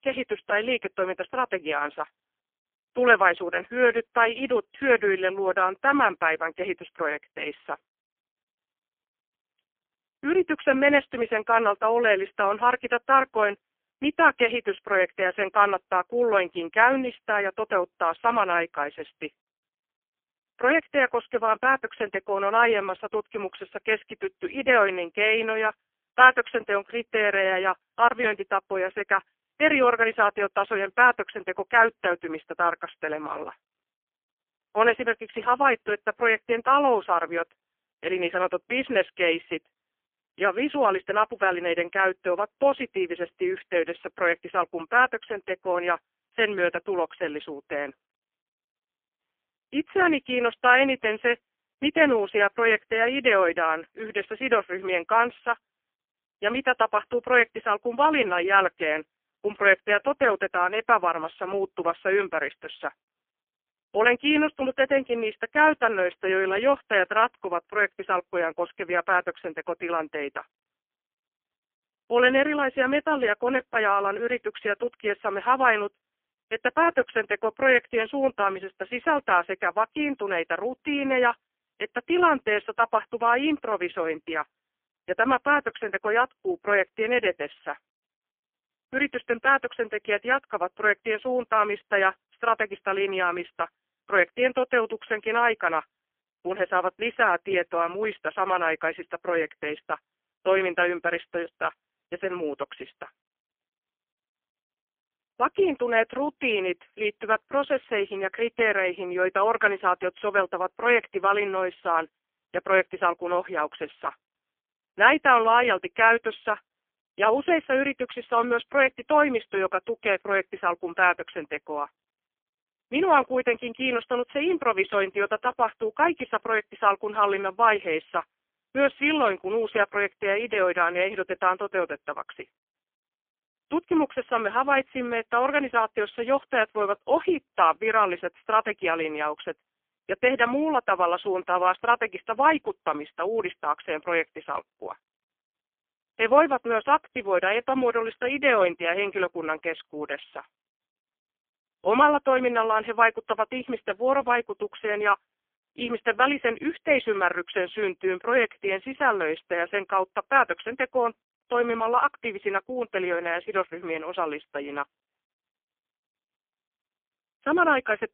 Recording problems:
phone-call audio; poor line; nothing above 3 kHz

